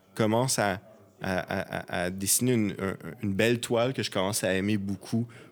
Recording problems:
background chatter; faint; throughout; 4 voices, 25 dB below the speech

